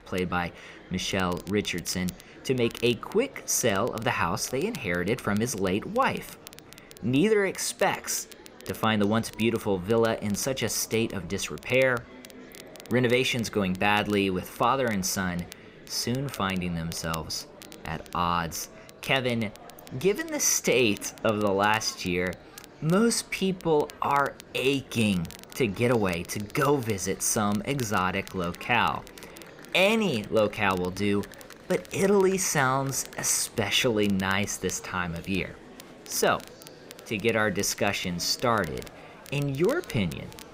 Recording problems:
murmuring crowd; faint; throughout; 20 dB below the speech
crackle, like an old record; faint; 20 dB below the speech

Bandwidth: 15.5 kHz